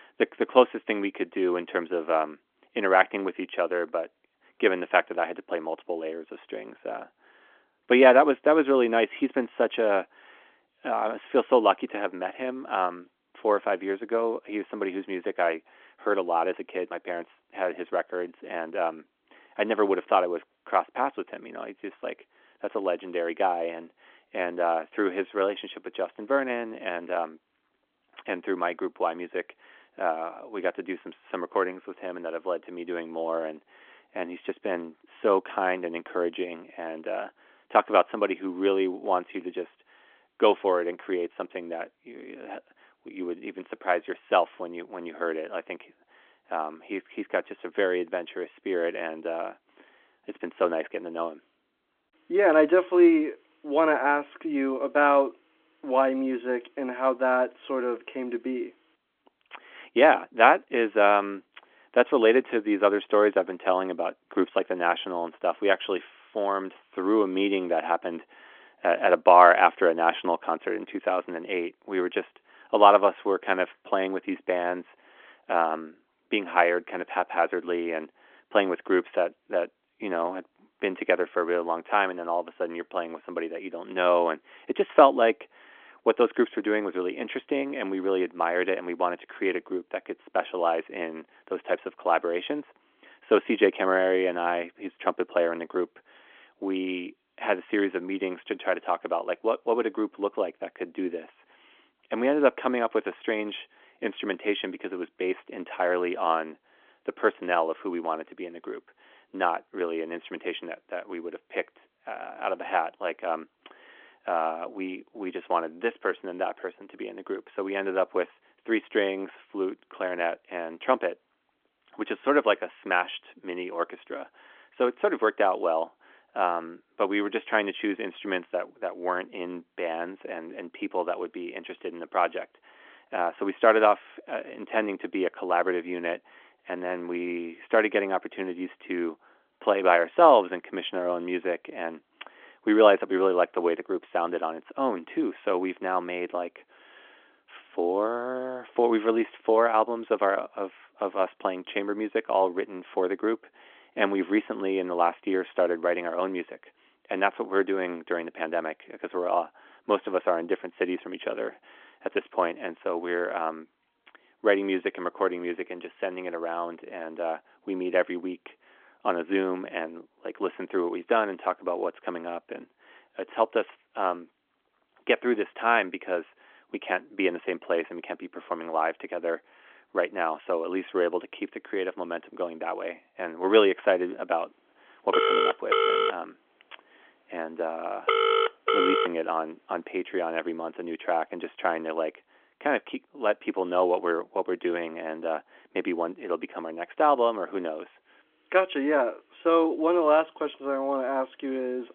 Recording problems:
phone-call audio; nothing above 3.5 kHz
phone ringing; loud; from 3:05 to 3:09; peak 5 dB above the speech

